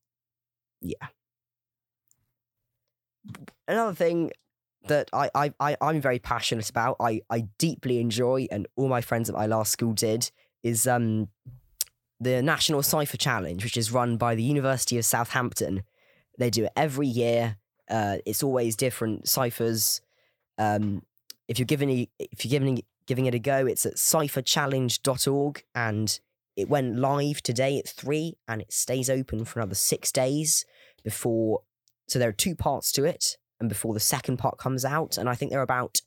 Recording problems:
none

